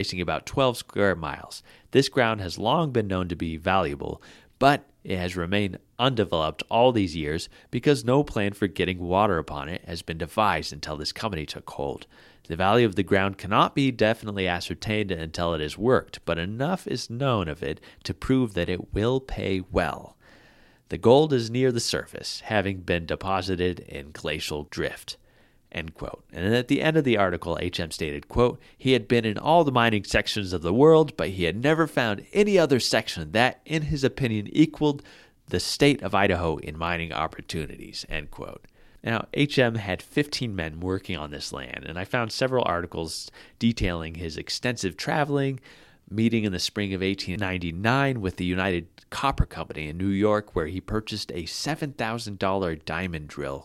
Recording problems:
abrupt cut into speech; at the start

